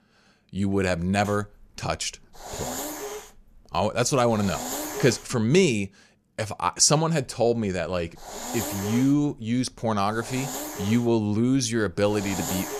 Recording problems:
hiss; loud; from 1.5 to 5.5 s and from 7 s on; 9 dB below the speech

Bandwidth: 14.5 kHz